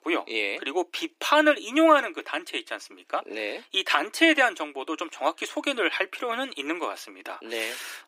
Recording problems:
thin; somewhat; fading below 300 Hz

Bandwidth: 15.5 kHz